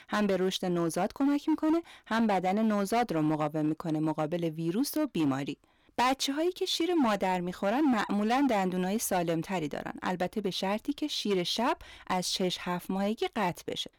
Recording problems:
distortion; slight; 9% of the sound clipped

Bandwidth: 19 kHz